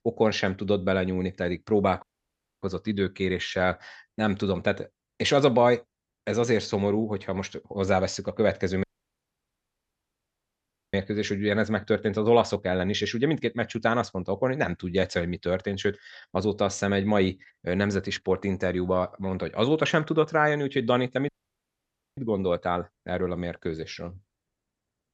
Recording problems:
audio cutting out; at 2 s for 0.5 s, at 9 s for 2 s and at 21 s for 1 s

